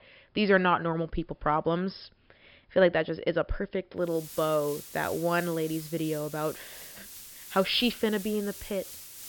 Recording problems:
high frequencies cut off; noticeable; nothing above 5 kHz
hiss; noticeable; from 4 s on; 15 dB below the speech

